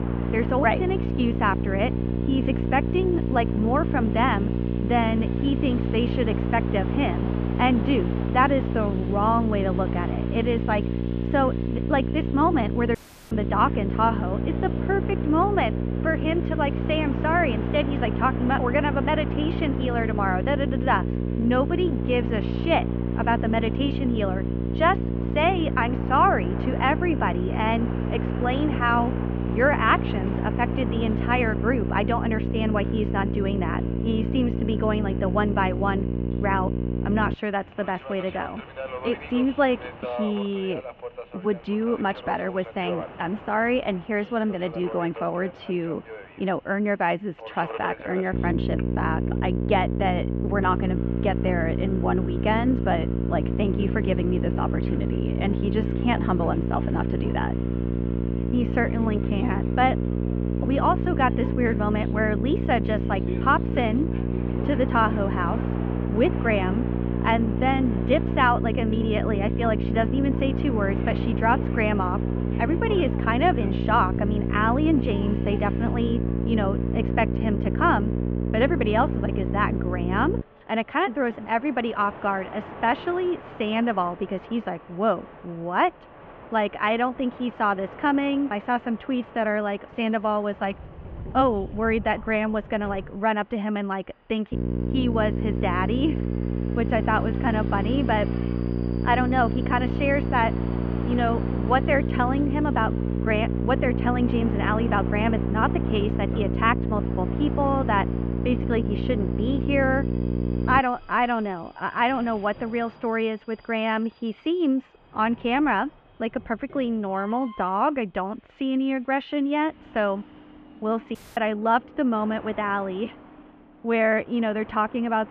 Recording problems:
muffled; very; fading above 3 kHz
electrical hum; loud; until 37 s, from 48 s to 1:20 and from 1:35 to 1:51; 60 Hz, 8 dB below the speech
train or aircraft noise; noticeable; throughout; 15 dB below the speech
household noises; faint; throughout; 25 dB below the speech
audio cutting out; at 13 s and at 2:01

